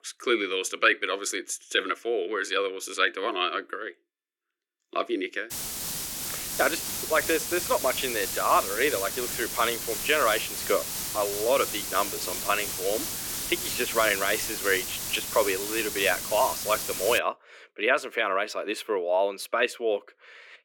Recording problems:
thin; very; fading below 300 Hz
hiss; loud; from 5.5 to 17 s; 3 dB below the speech

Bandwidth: 17 kHz